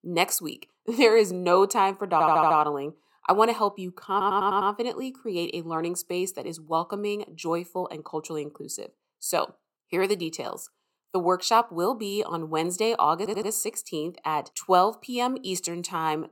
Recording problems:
audio stuttering; at 2 s, at 4 s and at 13 s

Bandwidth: 17 kHz